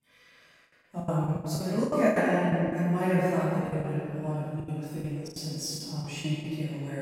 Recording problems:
room echo; strong; dies away in 2.4 s
off-mic speech; far
choppy; very; 14% of the speech affected
abrupt cut into speech; at the end

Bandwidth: 16 kHz